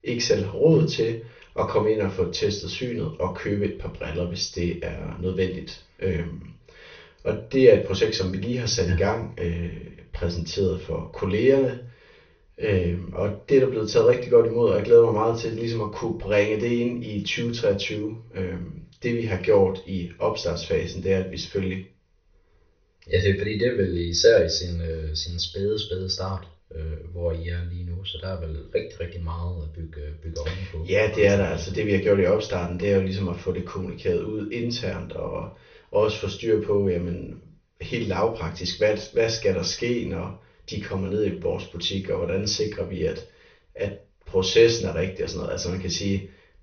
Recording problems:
off-mic speech; far
high frequencies cut off; noticeable; nothing above 6.5 kHz
room echo; slight; dies away in 0.3 s

